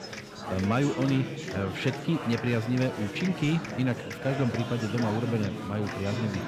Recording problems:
chatter from many people; loud; throughout; 6 dB below the speech

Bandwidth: 15 kHz